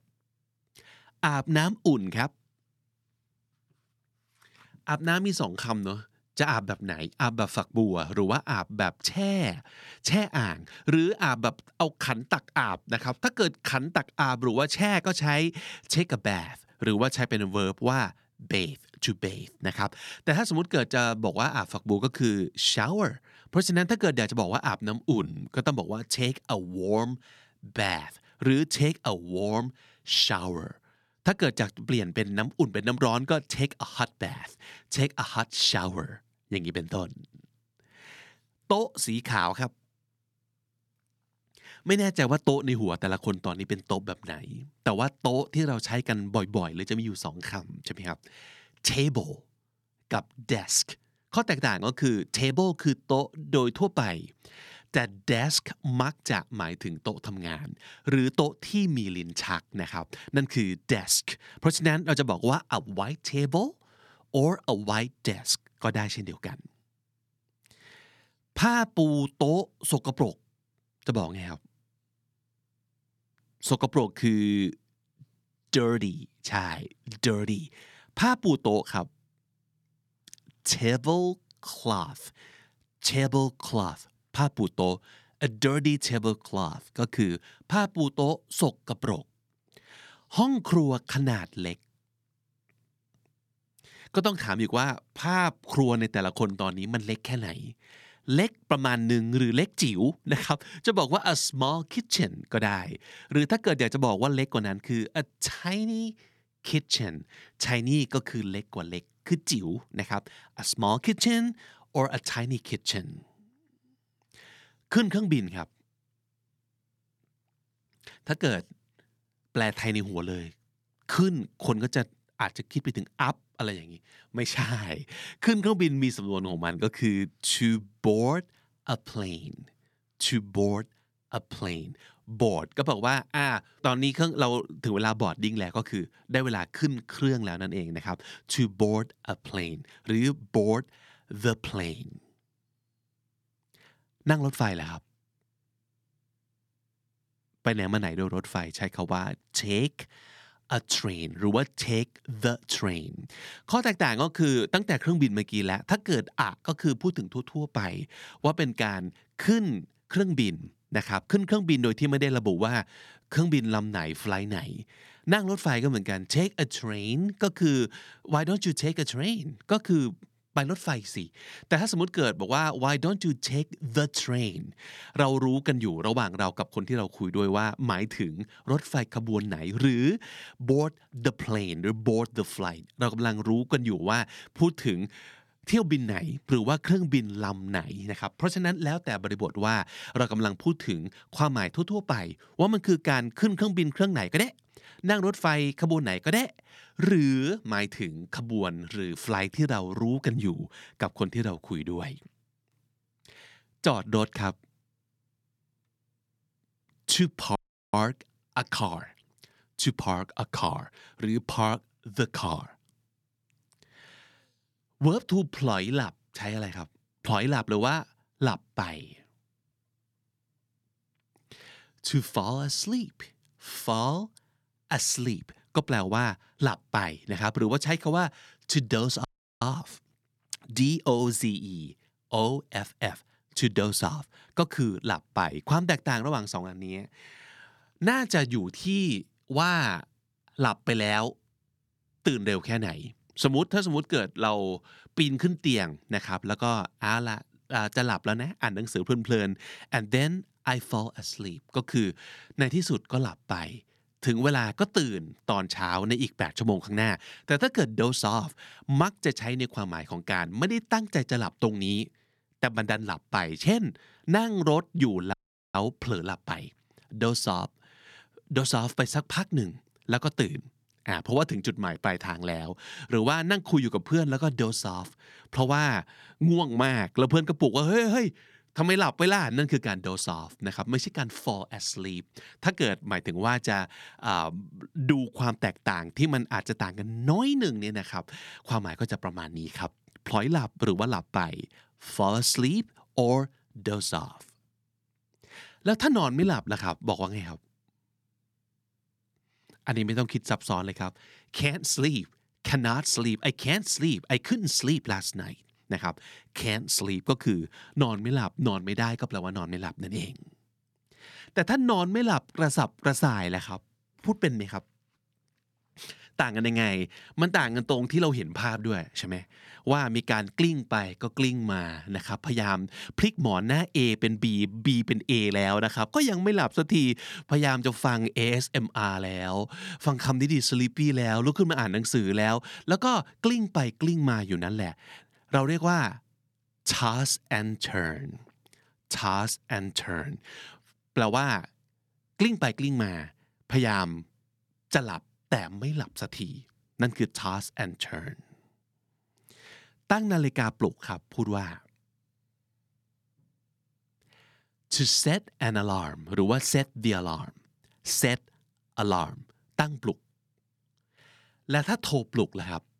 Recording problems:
audio cutting out; at 3:28, at 3:49 and at 4:25

